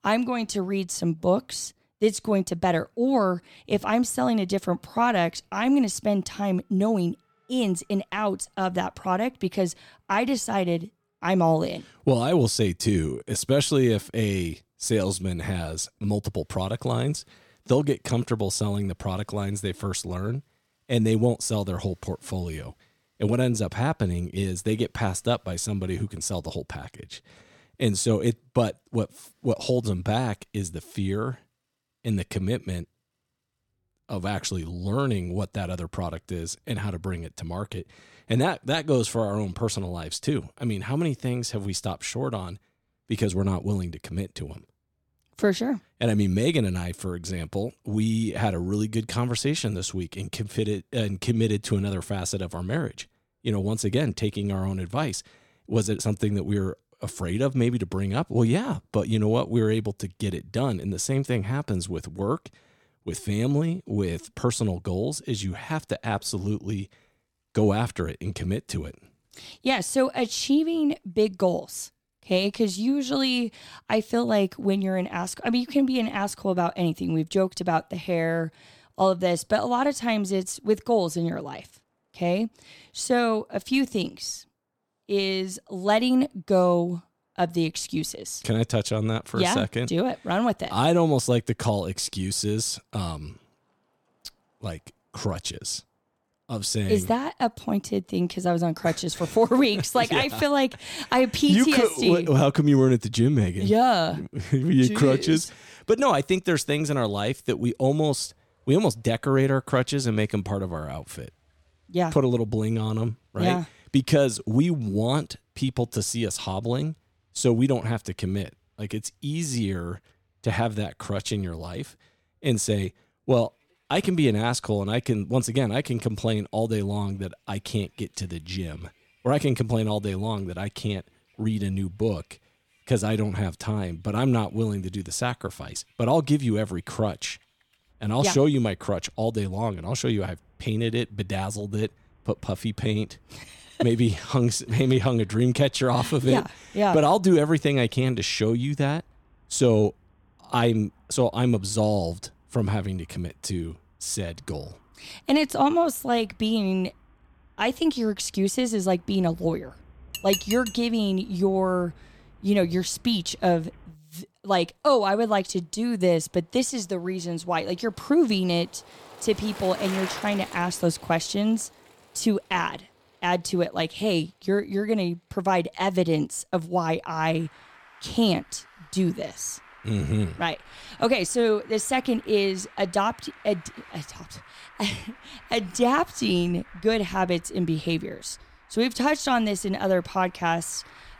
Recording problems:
traffic noise; faint; throughout; 25 dB below the speech
clattering dishes; noticeable; at 2:40; peak 3 dB below the speech

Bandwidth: 17 kHz